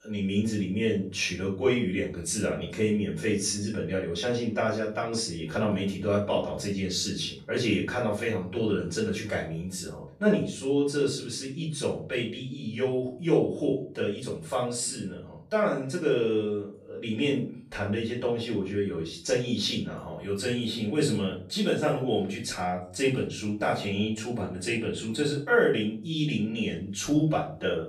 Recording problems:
off-mic speech; far
room echo; slight; dies away in 0.4 s

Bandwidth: 14.5 kHz